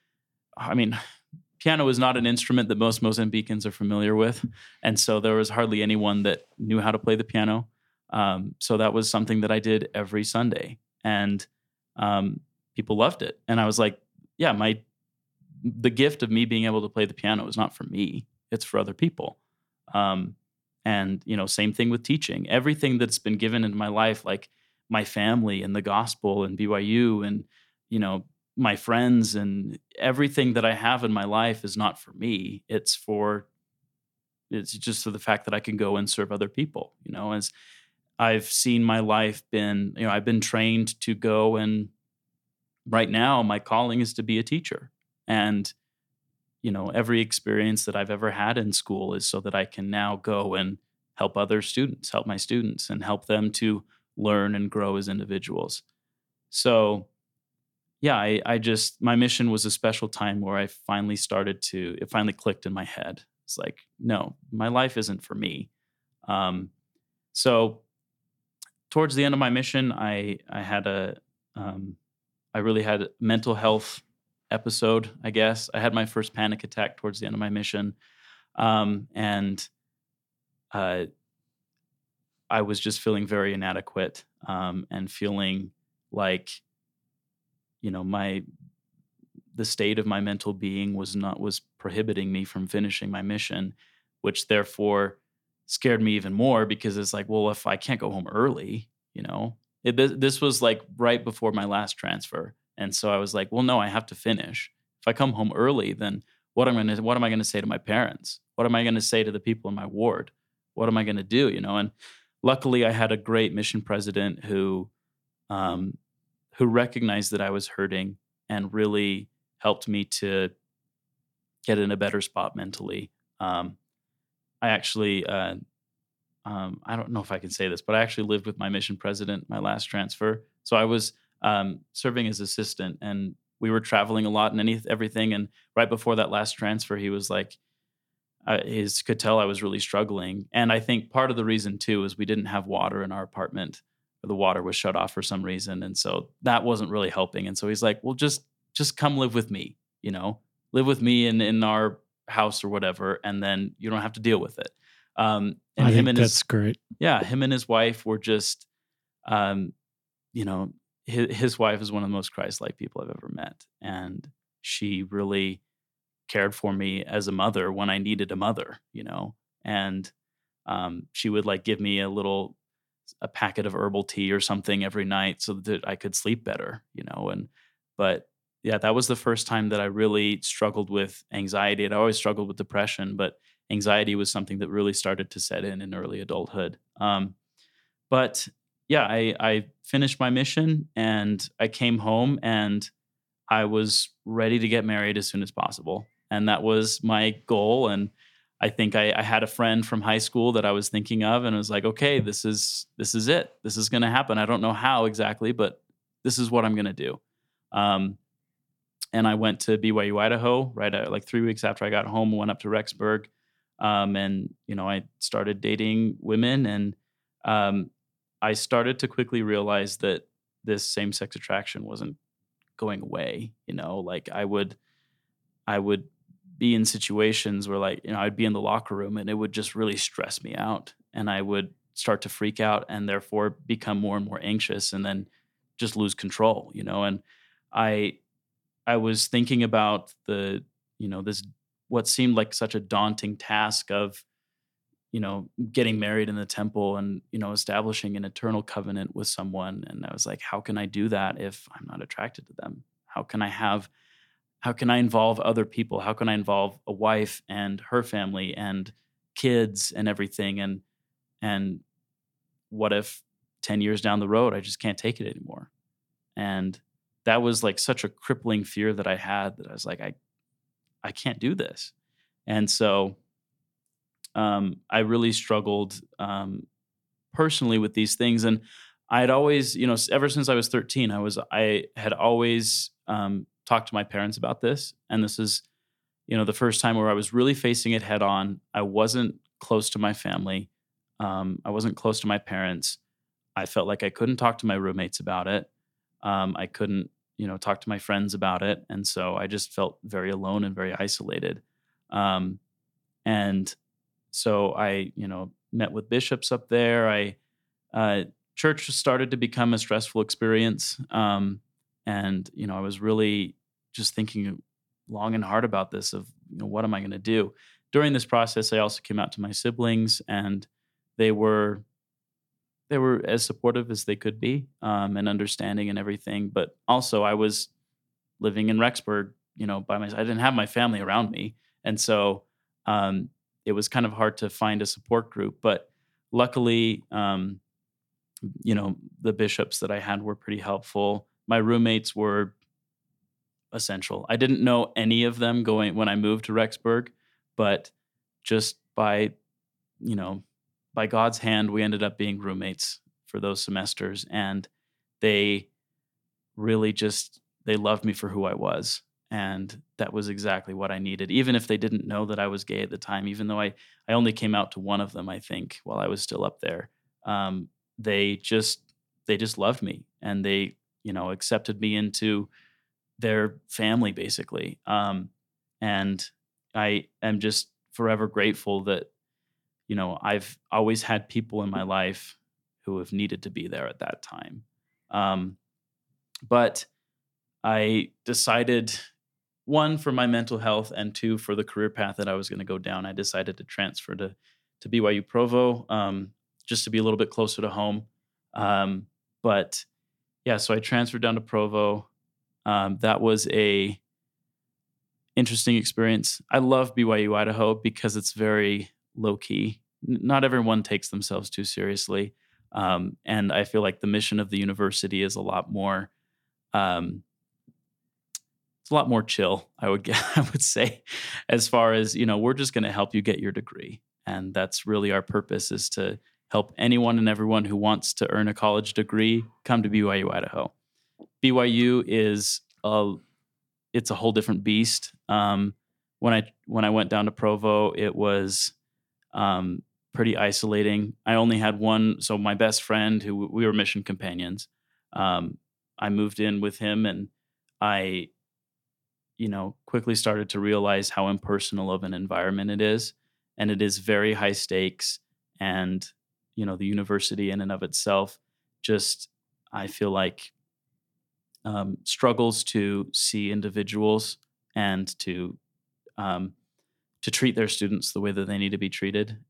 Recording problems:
none

